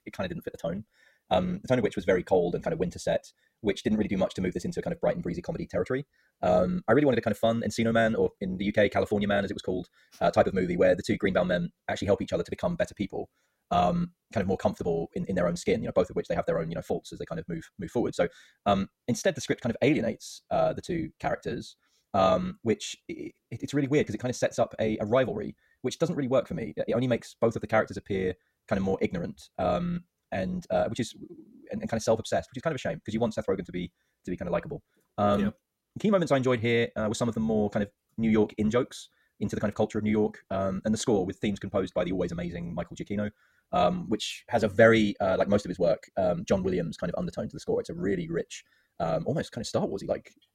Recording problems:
wrong speed, natural pitch; too fast; 1.6 times normal speed

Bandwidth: 16 kHz